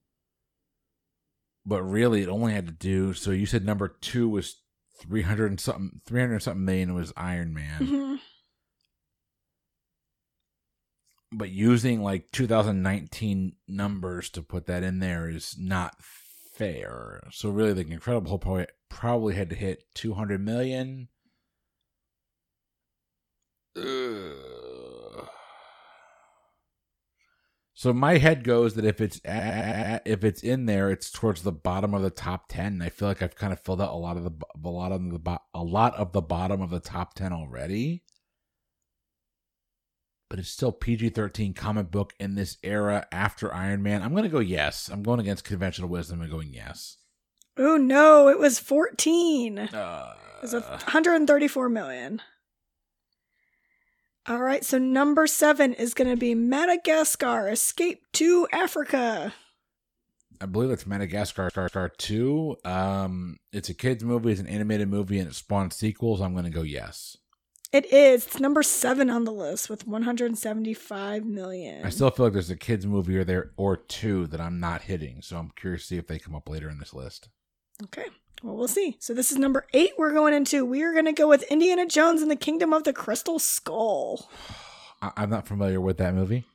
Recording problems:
audio stuttering; at 29 s and at 1:01

